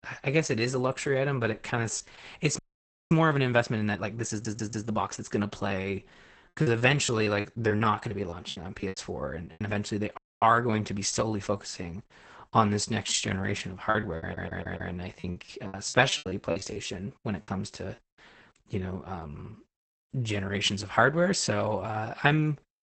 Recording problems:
garbled, watery; badly; nothing above 8 kHz
audio freezing; at 2.5 s for 0.5 s and at 10 s
audio stuttering; at 4.5 s and at 14 s
choppy; very; from 6.5 to 9.5 s and from 14 to 17 s; 15% of the speech affected

